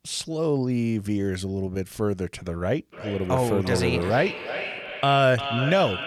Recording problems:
echo of what is said; strong; from 3 s on; 350 ms later, 8 dB below the speech

